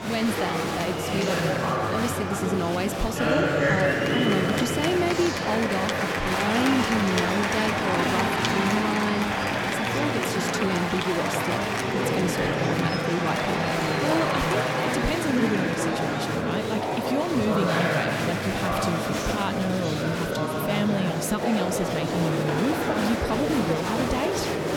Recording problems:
murmuring crowd; very loud; throughout; 3 dB above the speech

